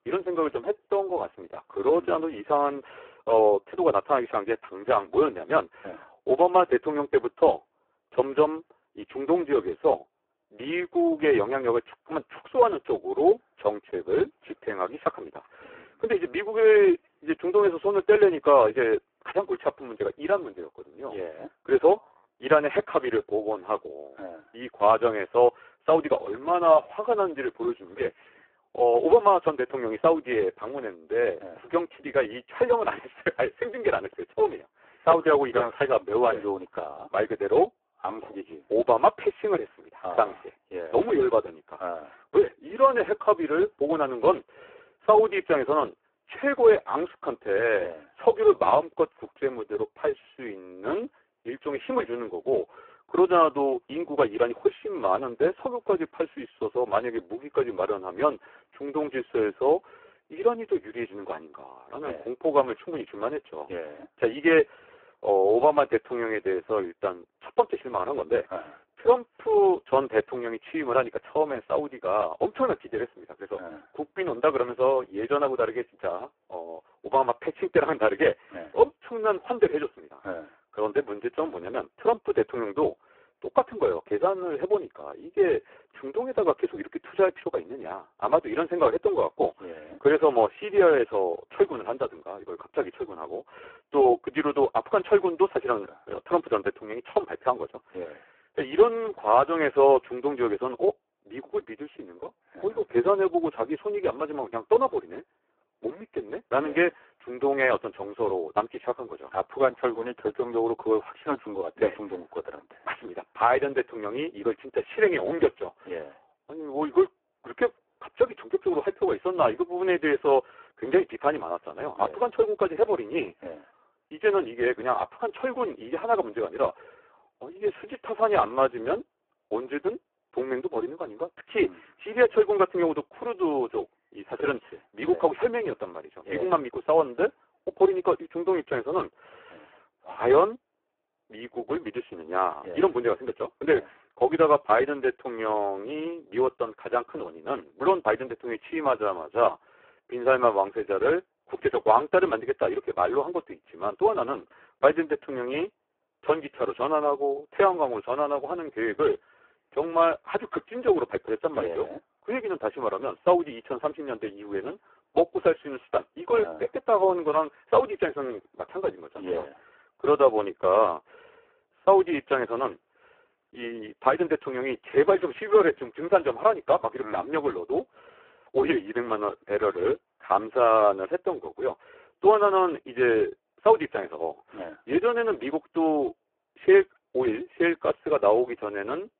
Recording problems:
phone-call audio; poor line

